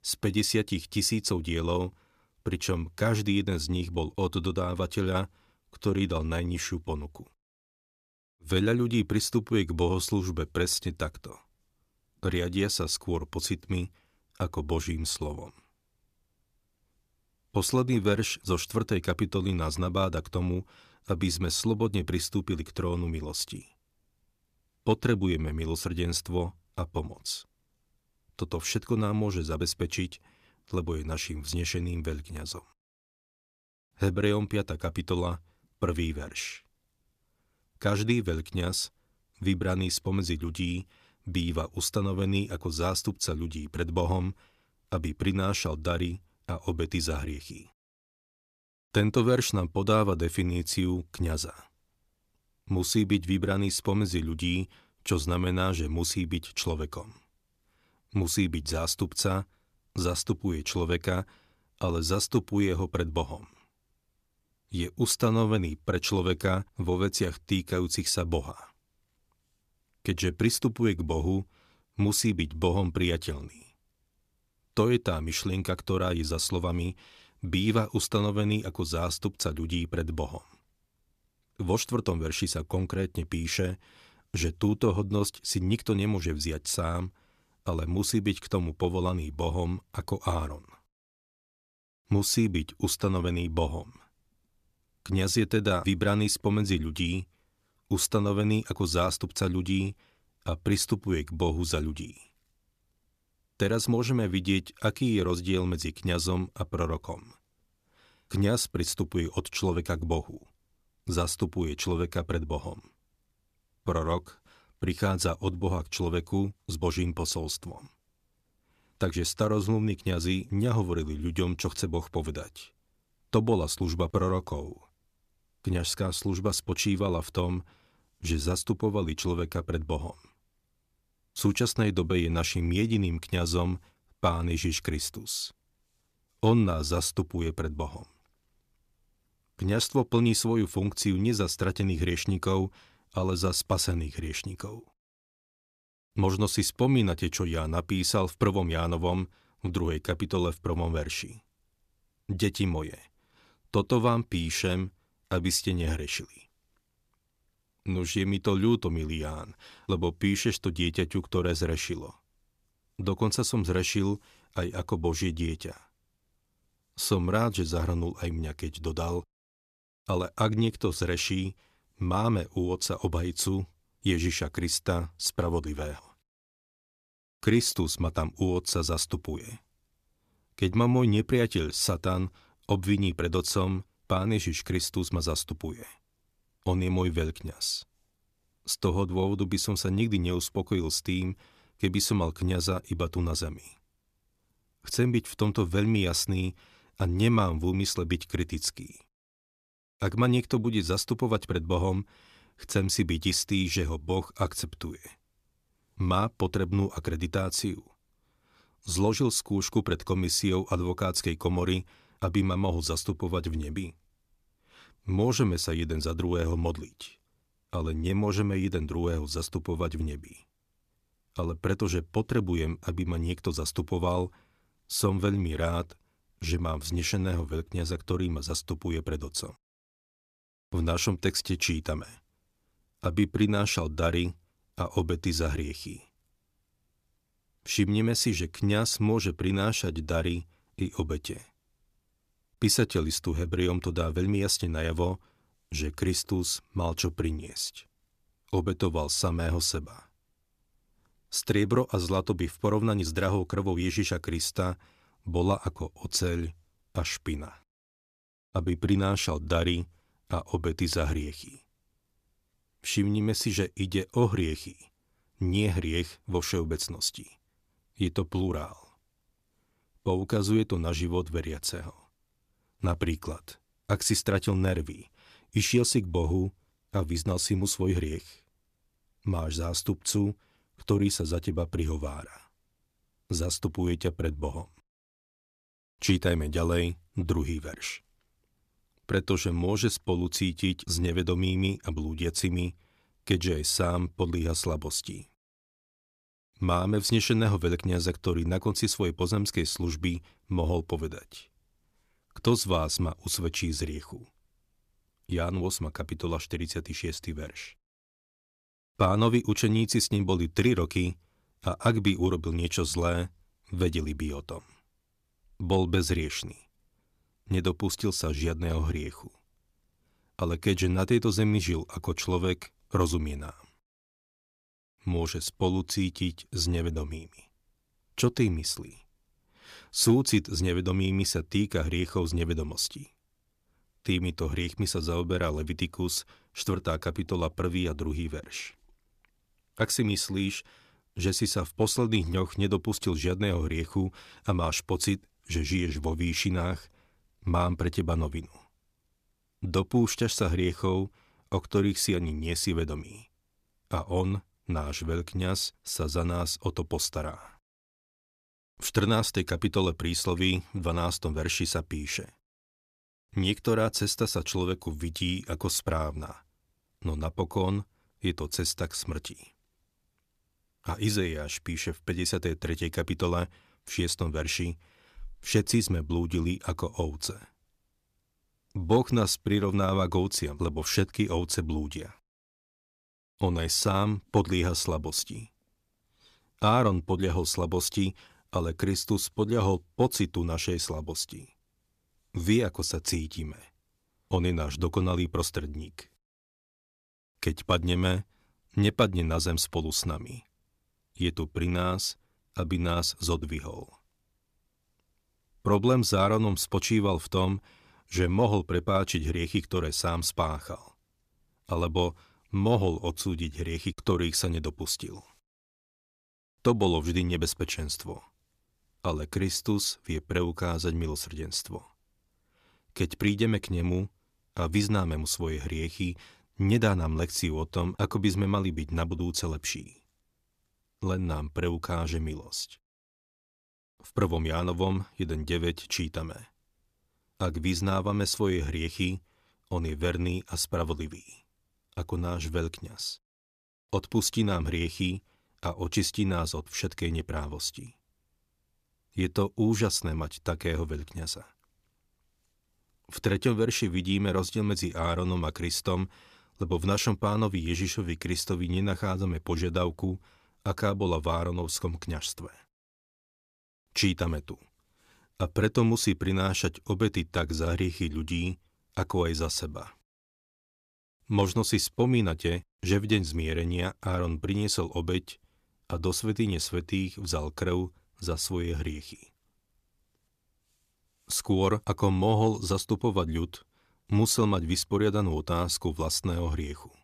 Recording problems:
none

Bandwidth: 14.5 kHz